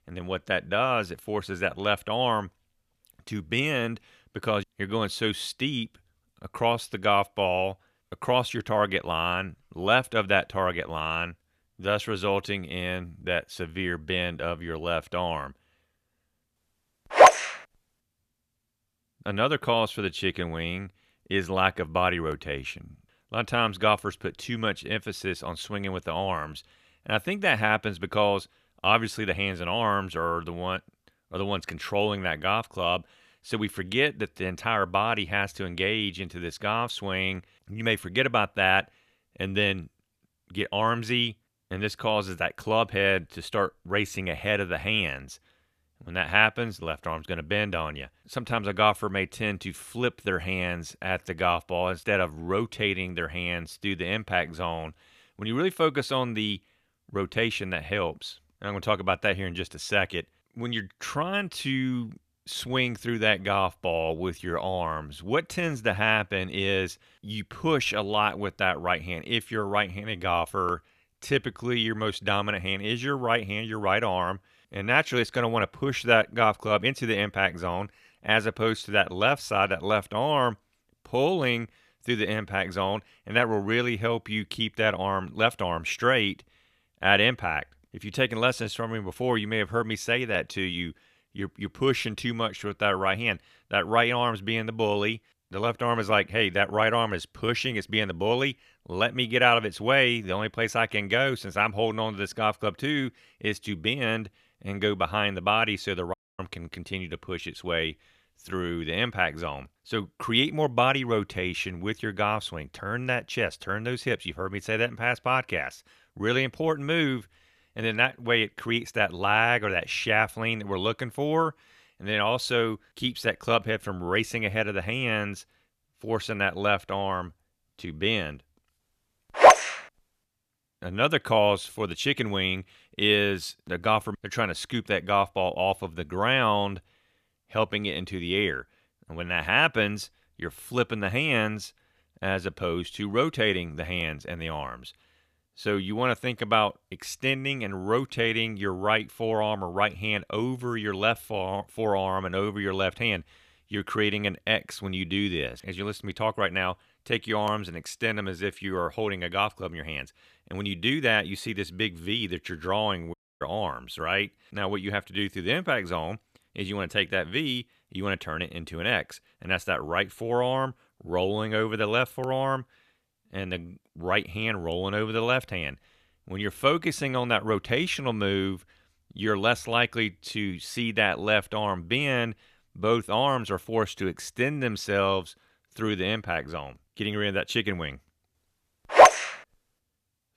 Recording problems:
audio cutting out; at 1:46 and at 2:43

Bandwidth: 14.5 kHz